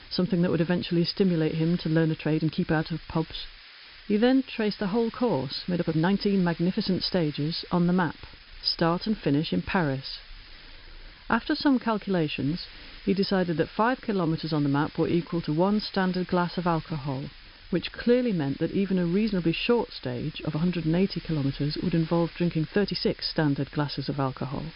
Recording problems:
high frequencies cut off; noticeable; nothing above 5.5 kHz
hiss; noticeable; throughout; 20 dB below the speech
uneven, jittery; strongly; from 2 to 23 s

